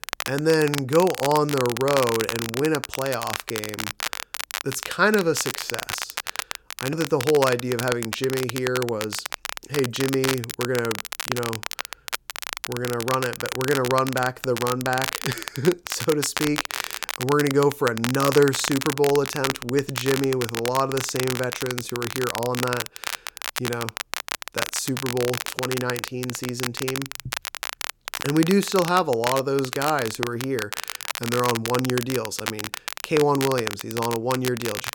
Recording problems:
crackle, like an old record; loud; 6 dB below the speech

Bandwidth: 17.5 kHz